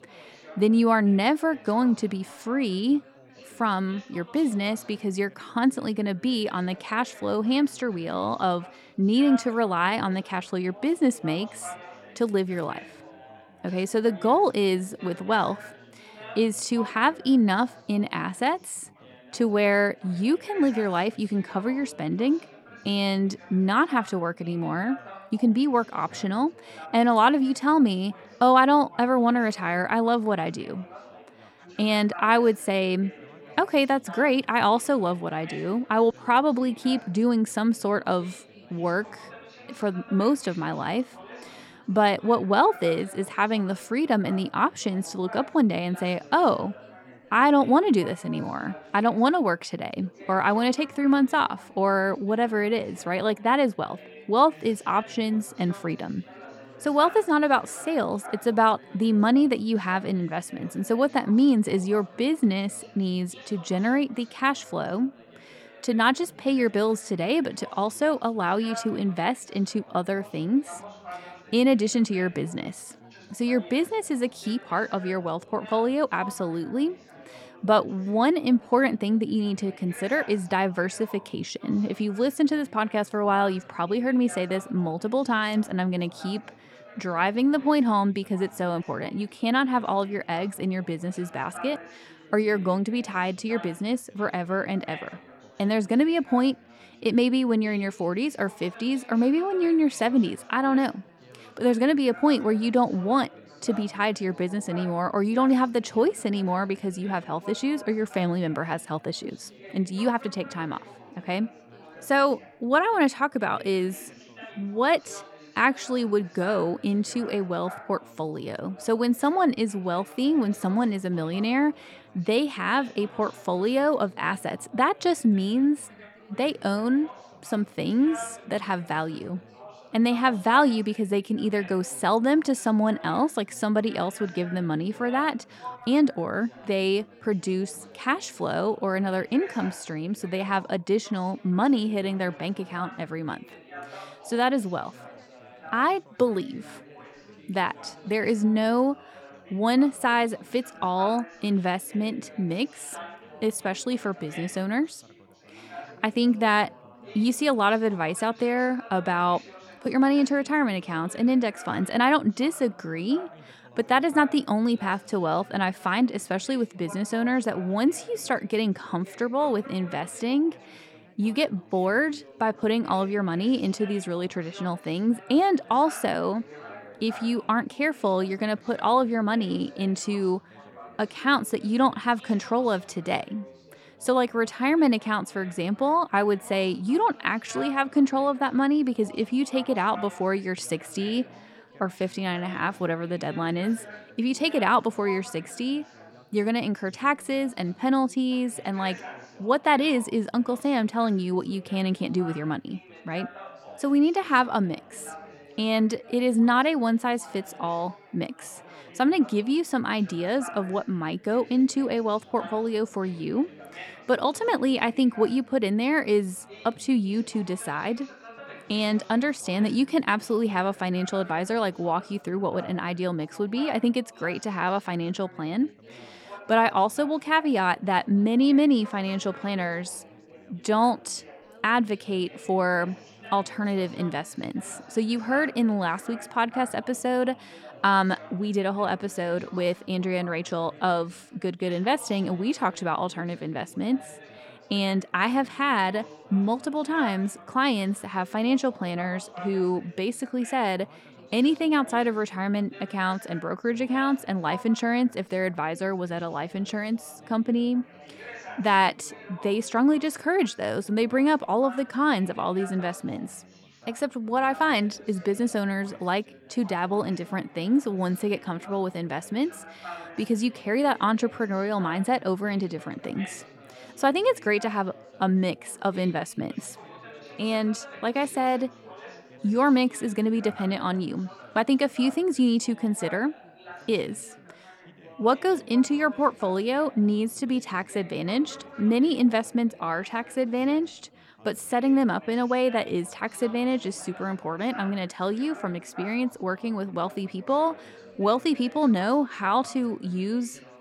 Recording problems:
background chatter; faint; throughout; 4 voices, 20 dB below the speech

